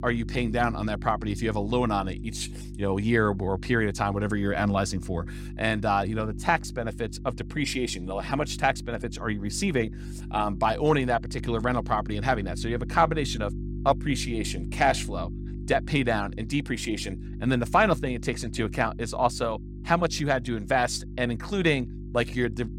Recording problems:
electrical hum; noticeable; throughout; 50 Hz, 20 dB below the speech

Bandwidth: 16 kHz